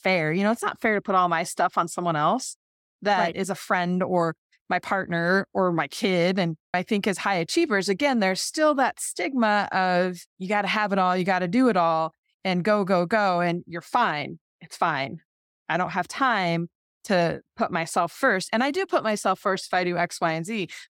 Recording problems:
none

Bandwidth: 17 kHz